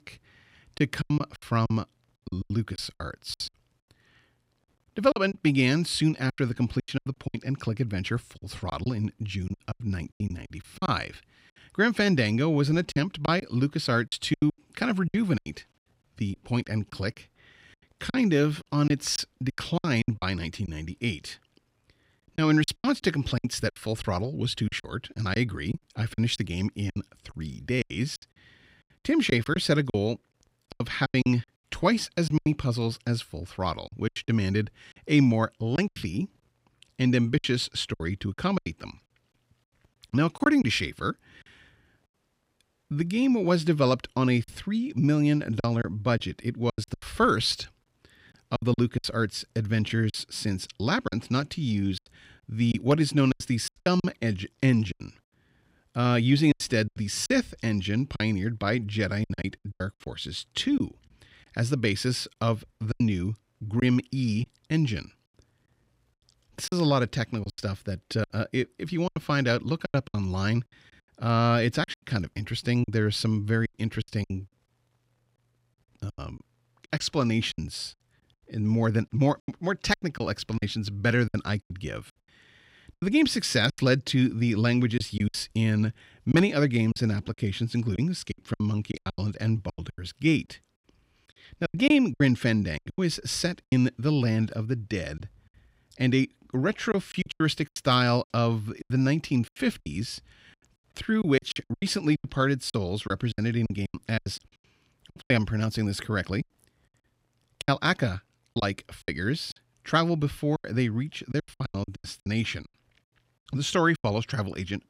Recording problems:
choppy; very; 12% of the speech affected

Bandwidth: 15.5 kHz